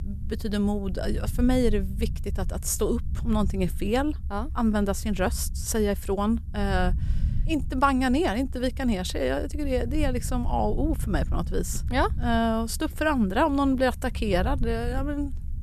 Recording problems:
low rumble; faint; throughout; 20 dB below the speech

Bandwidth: 13.5 kHz